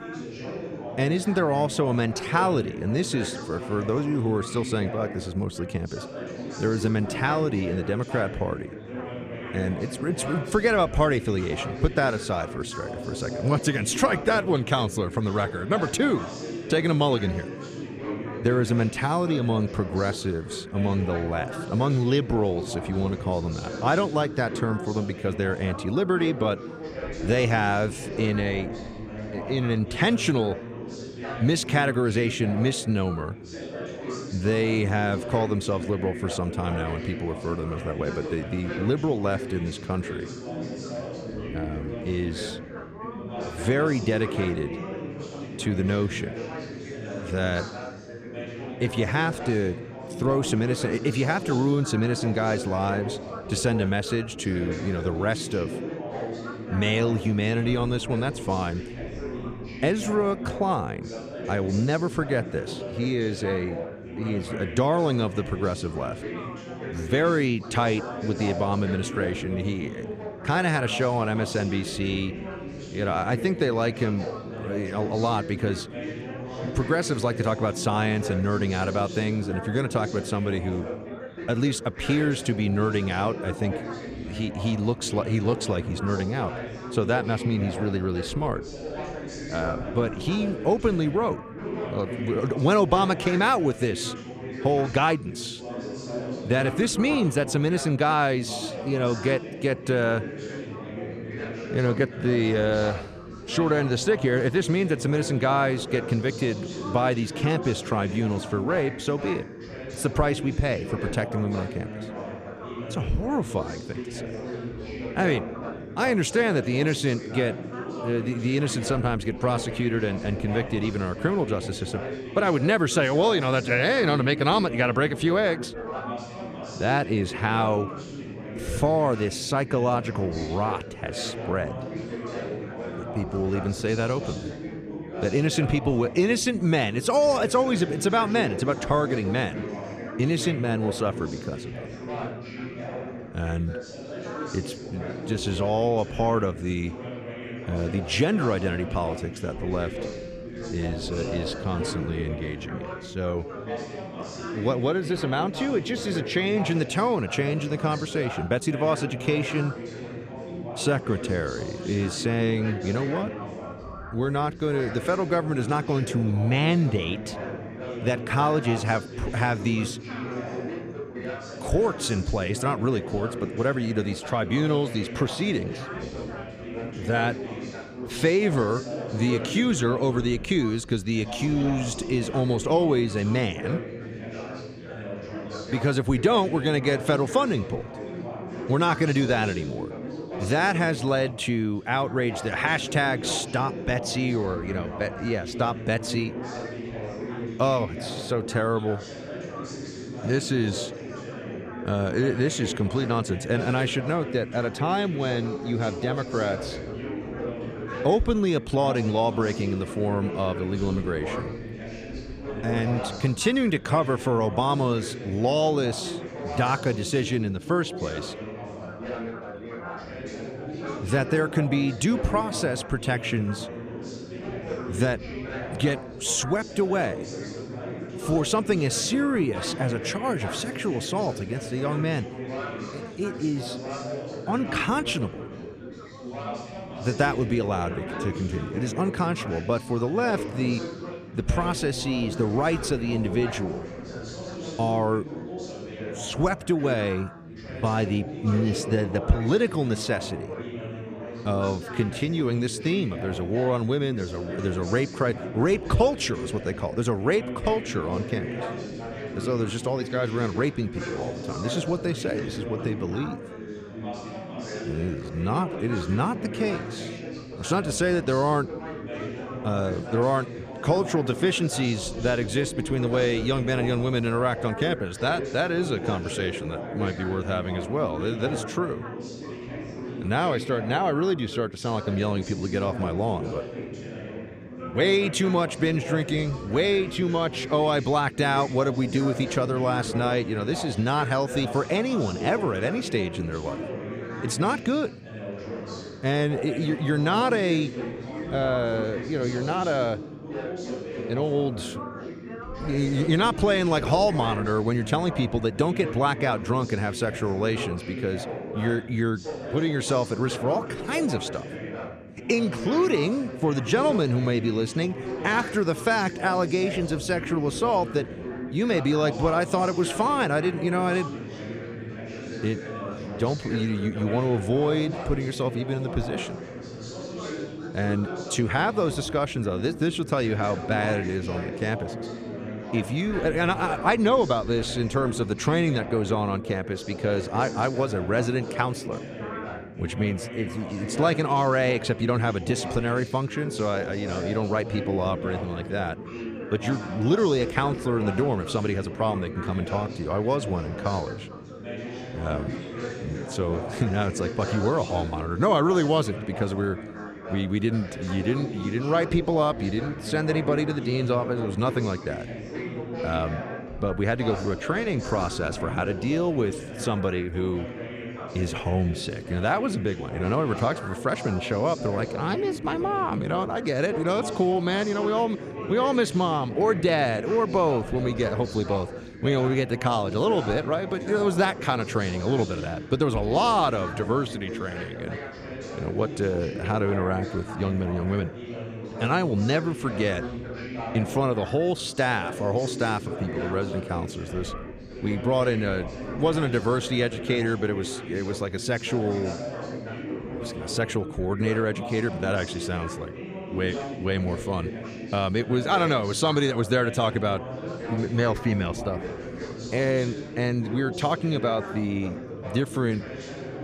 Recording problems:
background chatter; loud; throughout; 4 voices, 9 dB below the speech

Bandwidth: 15 kHz